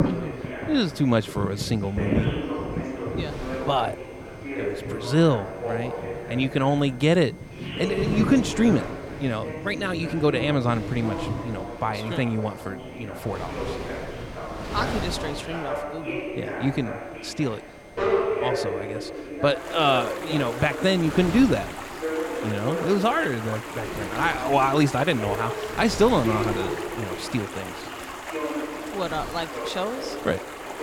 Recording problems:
background chatter; loud; throughout; 2 voices, 8 dB below the speech
rain or running water; noticeable; throughout; 10 dB below the speech
wind noise on the microphone; occasional gusts; 15 dB below the speech
high-pitched whine; faint; throughout; 2 kHz, 30 dB below the speech

